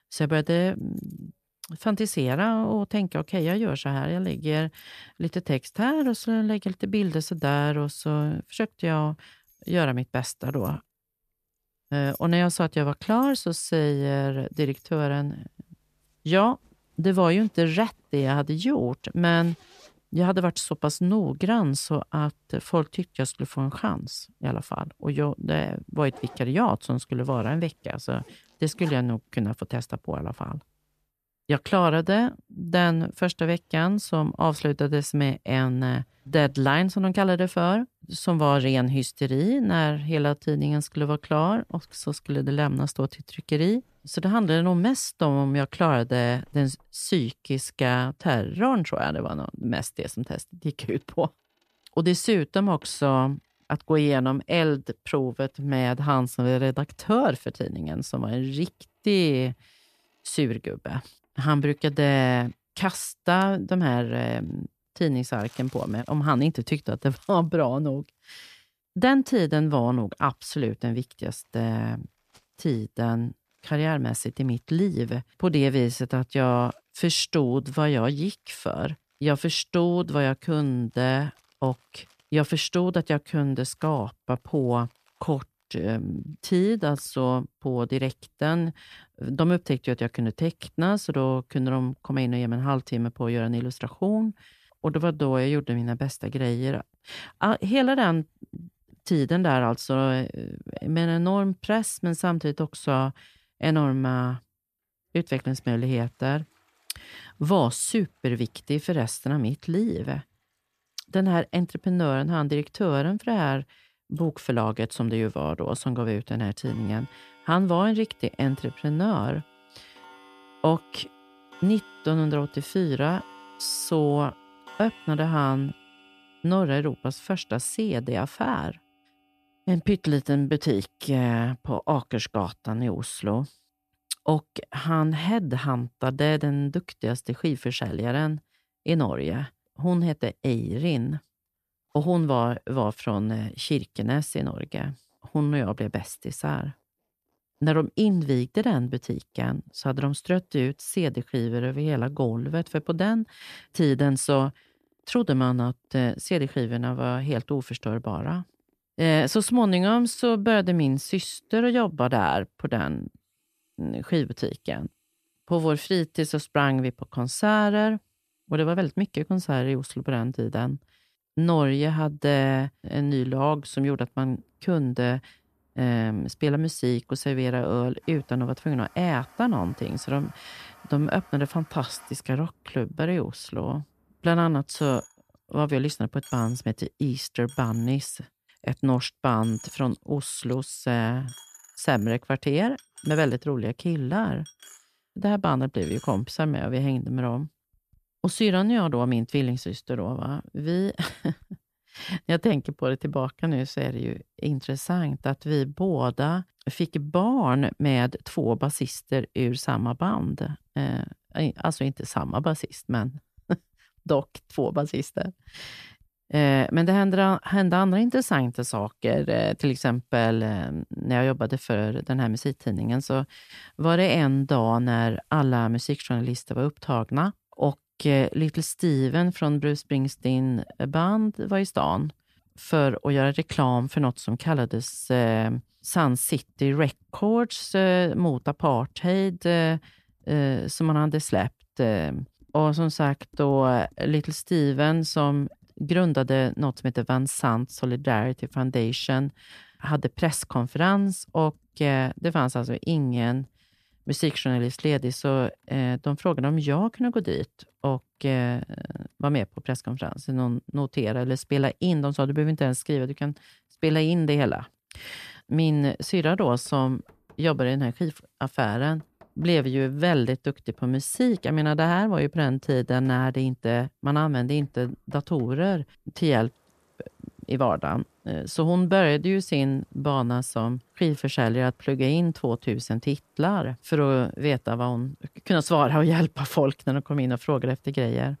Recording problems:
household noises; faint; throughout; 30 dB below the speech

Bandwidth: 14.5 kHz